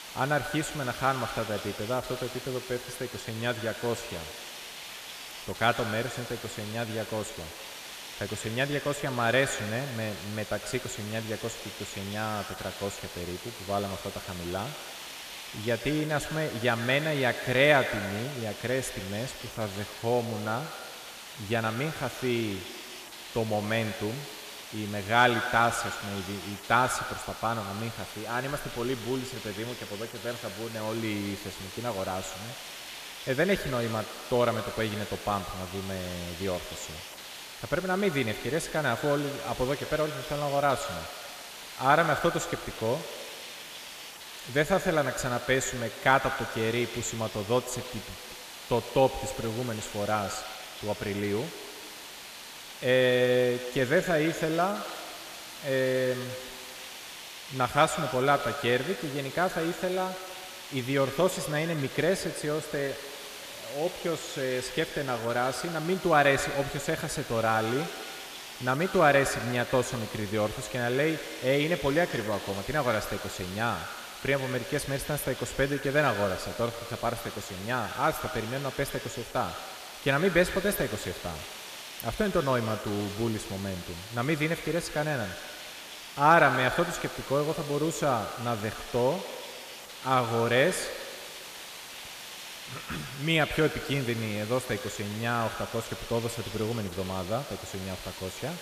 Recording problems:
echo of what is said; strong; throughout; 110 ms later, 10 dB below the speech
hiss; noticeable; throughout; 10 dB below the speech

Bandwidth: 14.5 kHz